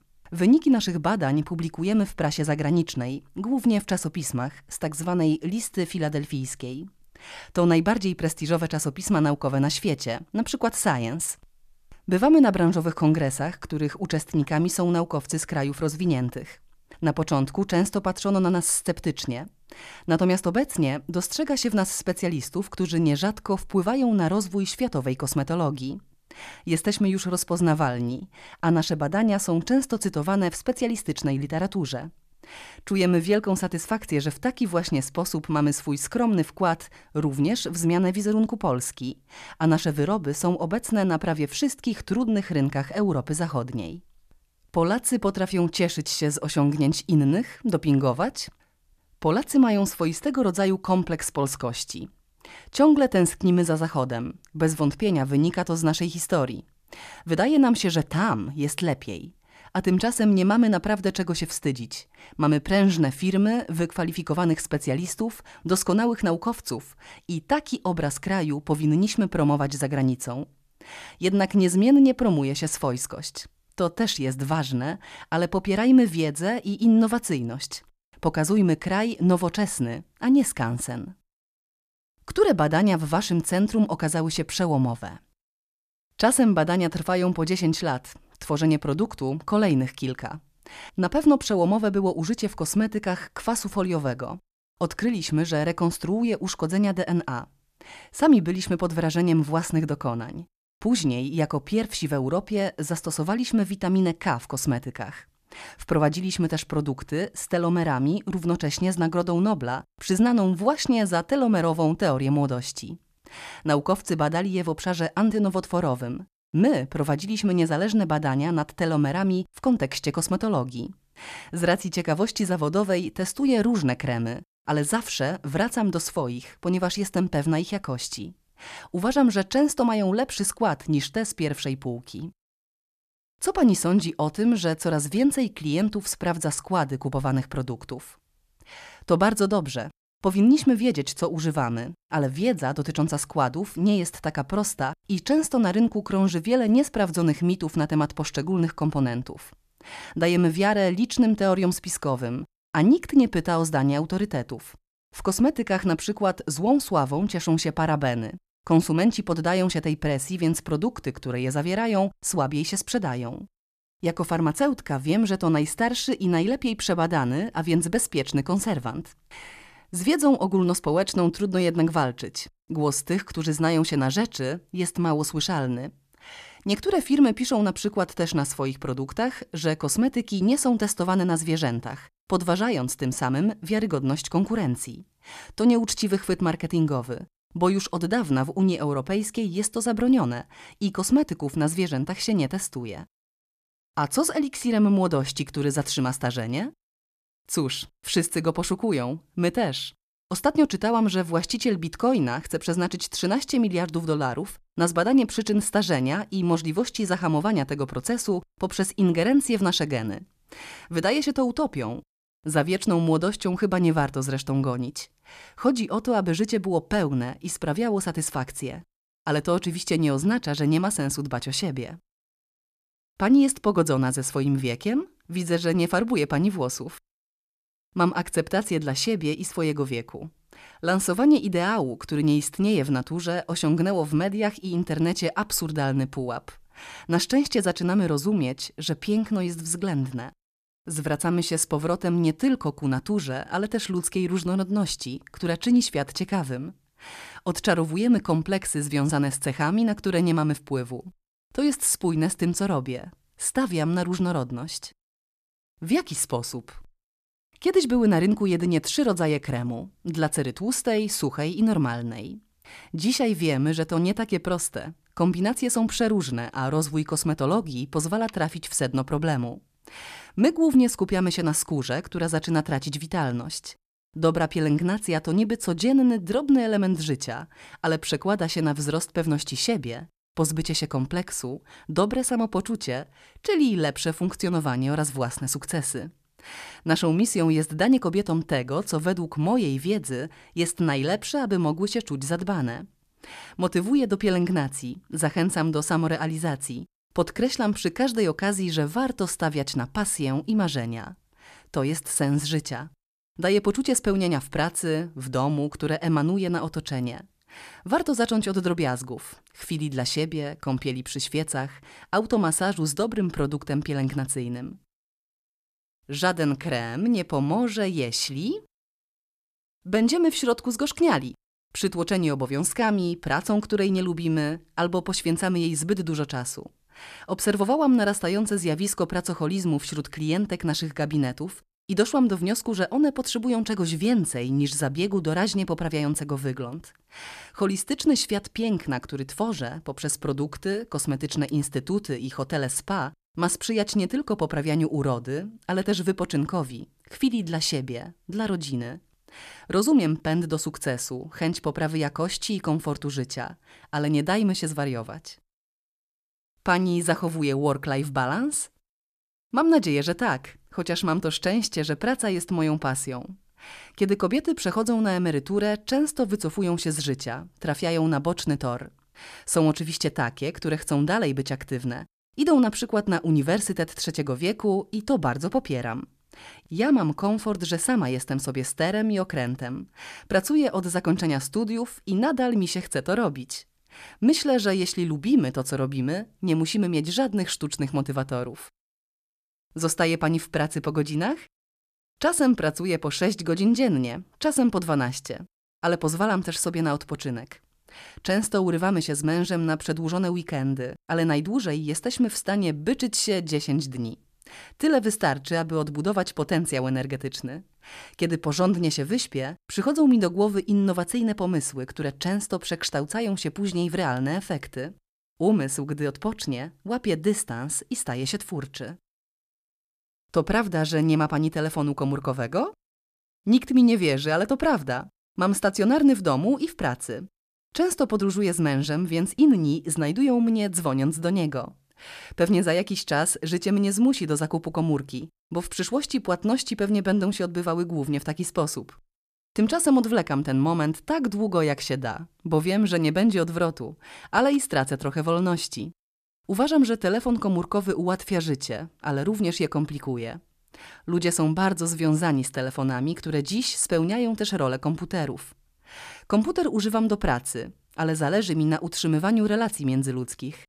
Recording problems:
none

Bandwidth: 14.5 kHz